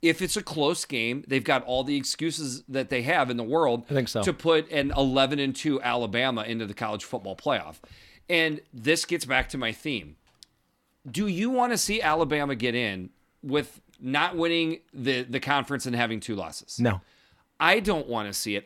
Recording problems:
none

